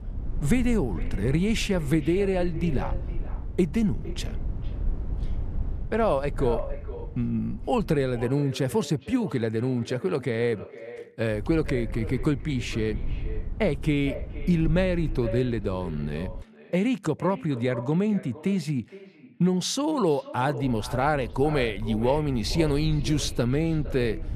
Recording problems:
echo of what is said; noticeable; throughout; 460 ms later, 15 dB below the speech
low rumble; faint; until 8 s, from 11 to 16 s and from 21 s on; 20 dB below the speech

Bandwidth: 14 kHz